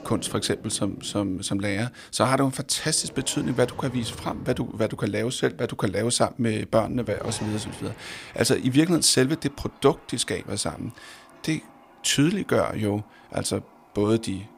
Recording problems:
household noises; faint; throughout; 20 dB below the speech

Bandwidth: 15.5 kHz